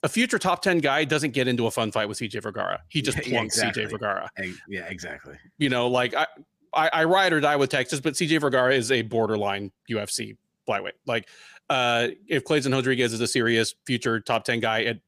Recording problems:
none

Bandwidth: 15 kHz